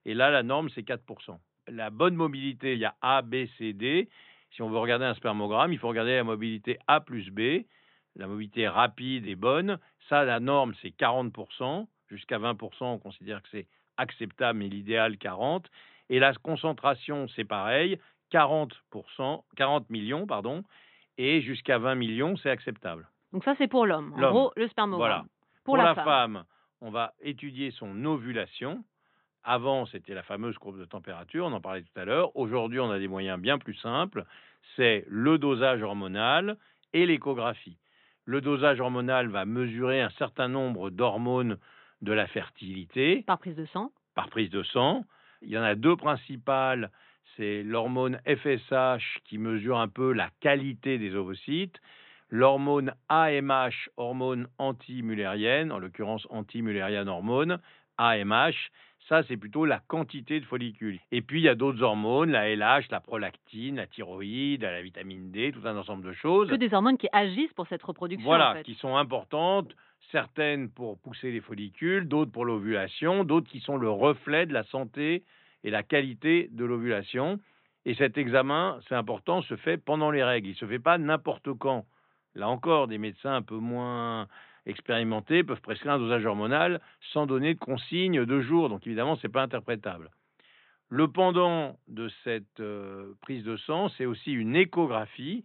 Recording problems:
high frequencies cut off; severe; nothing above 4 kHz

